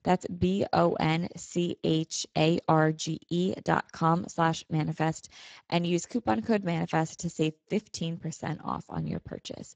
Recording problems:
garbled, watery; badly; nothing above 7.5 kHz

